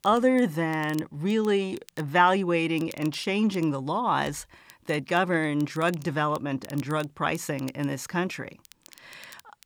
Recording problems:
crackle, like an old record; faint; 25 dB below the speech

